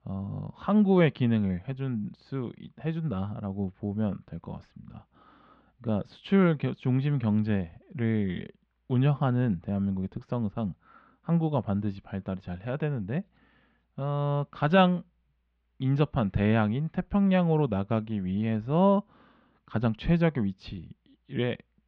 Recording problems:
muffled; very; fading above 3 kHz

